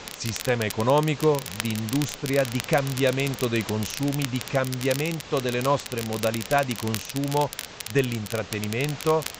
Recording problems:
high frequencies cut off; noticeable; nothing above 8 kHz
crackle, like an old record; loud; 10 dB below the speech
hiss; noticeable; throughout; 15 dB below the speech

